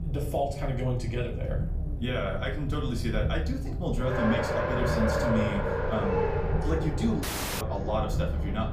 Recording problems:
room echo; very slight; dies away in 0.4 s
off-mic speech; somewhat distant
traffic noise; loud; throughout; 2 dB below the speech
low rumble; noticeable; throughout; 10 dB below the speech
audio cutting out; at 7 s

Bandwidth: 15 kHz